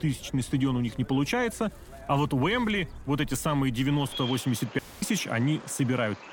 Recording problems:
animal sounds; noticeable; throughout; 15 dB below the speech
audio cutting out; at 5 s

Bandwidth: 17 kHz